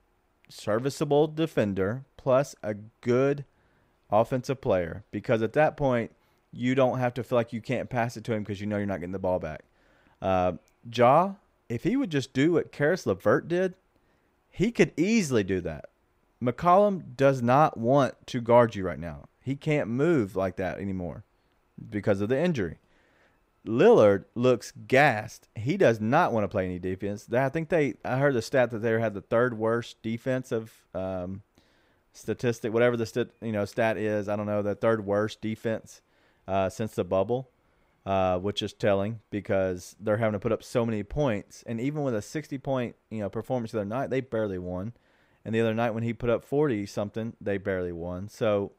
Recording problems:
none

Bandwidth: 15.5 kHz